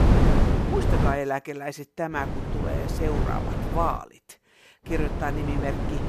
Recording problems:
wind noise on the microphone; heavy; until 1 s, from 2 to 4 s and from 5 s on; 2 dB below the speech

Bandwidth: 14 kHz